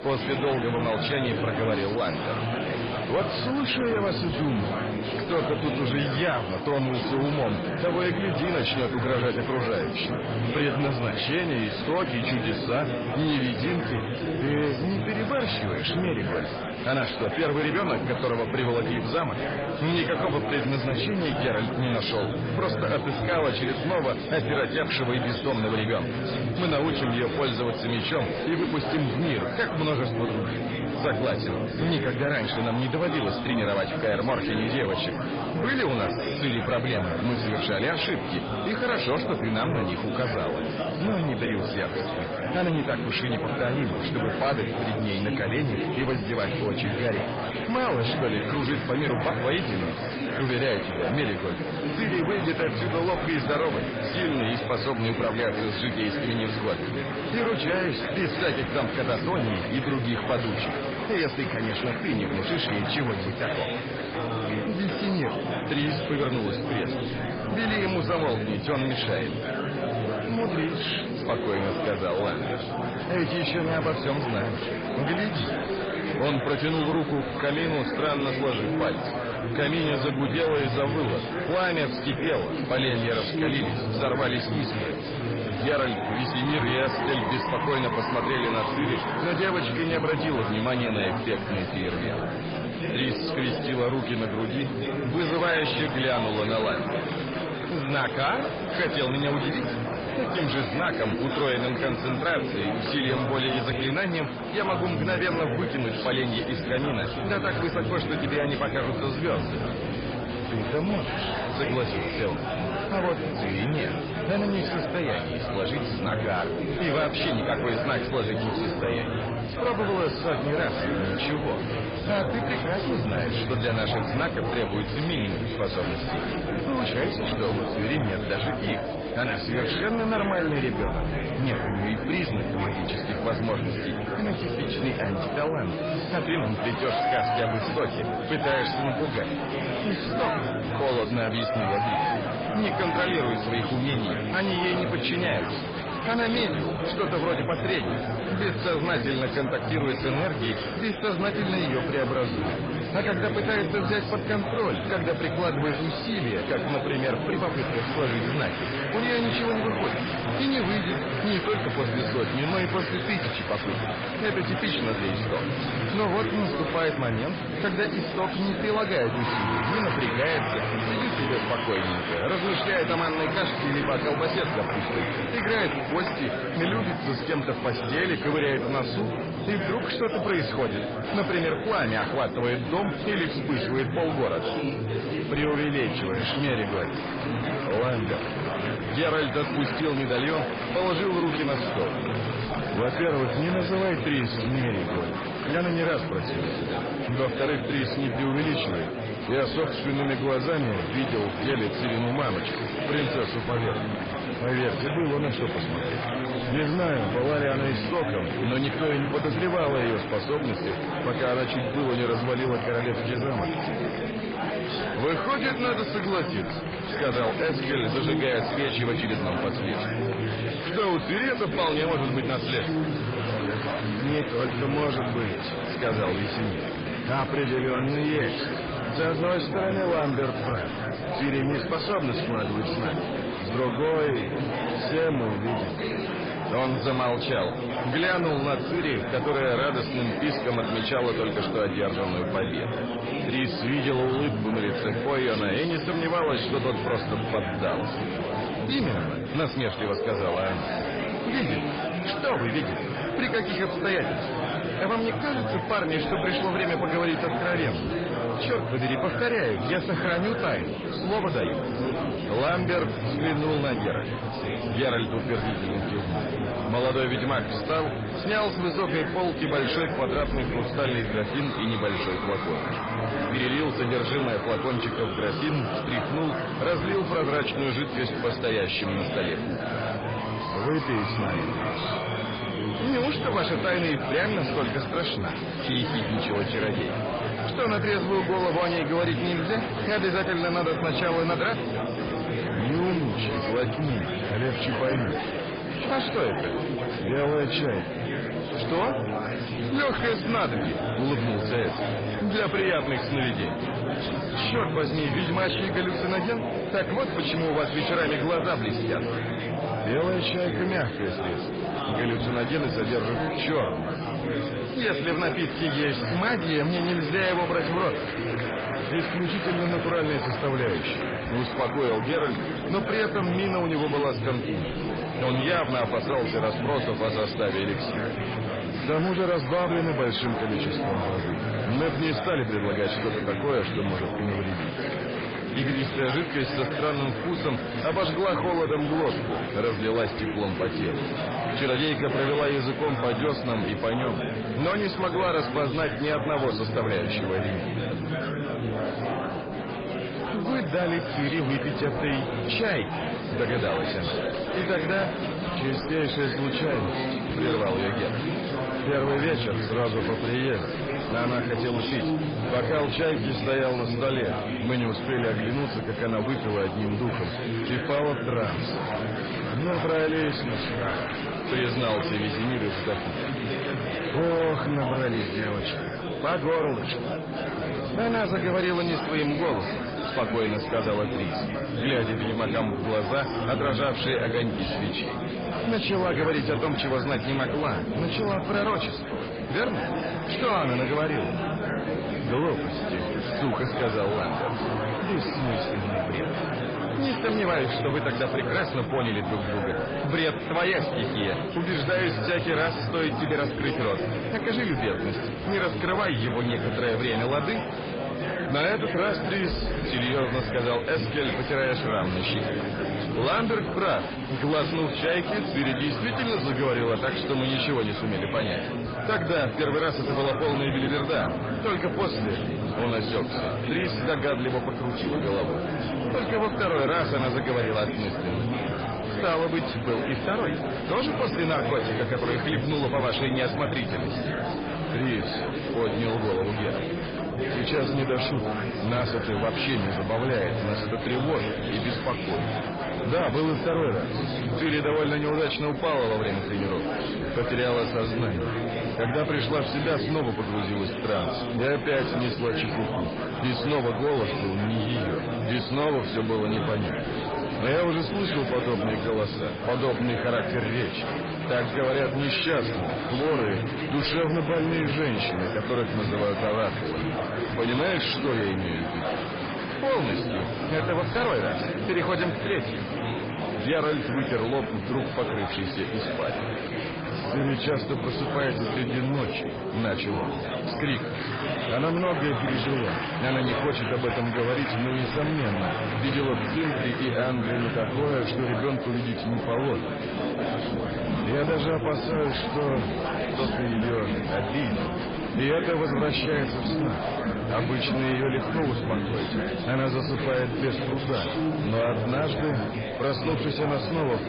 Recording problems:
garbled, watery; badly; nothing above 5 kHz
distortion; slight; 10 dB below the speech
murmuring crowd; loud; throughout; 2 dB below the speech

